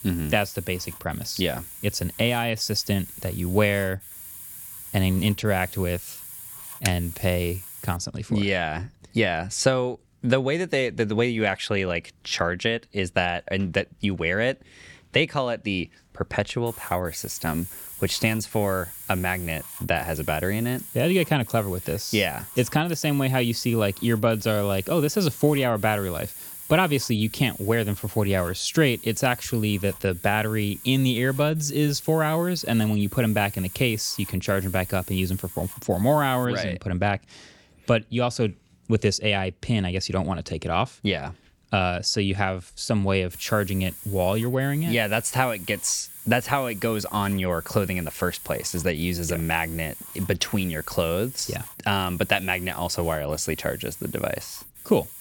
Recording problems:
hiss; noticeable; until 8 s, from 17 to 36 s and from 43 s on; 15 dB below the speech
keyboard typing; very faint; at 7 s; peak 6 dB below the speech

